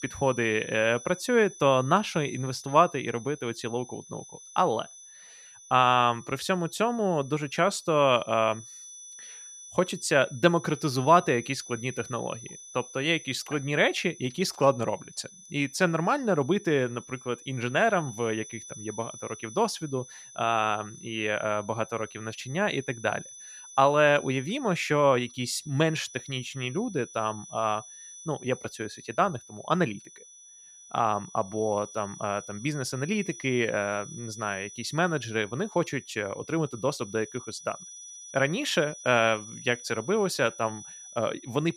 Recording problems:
high-pitched whine; noticeable; throughout; 6 kHz, 15 dB below the speech

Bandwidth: 14.5 kHz